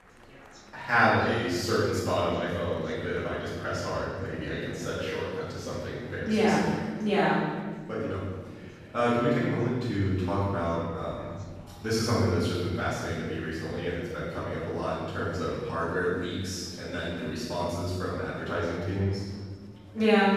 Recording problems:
room echo; strong; dies away in 1.5 s
off-mic speech; far
murmuring crowd; faint; throughout; 25 dB below the speech

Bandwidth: 14 kHz